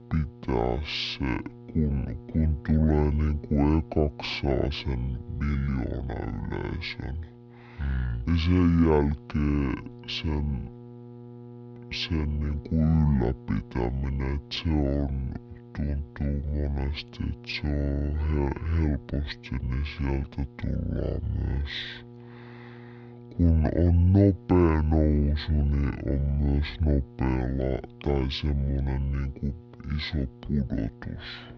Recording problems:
wrong speed and pitch; too slow and too low; 0.5 times normal speed
muffled; very slightly; fading above 4 kHz
electrical hum; noticeable; throughout; 60 Hz, 20 dB below the speech

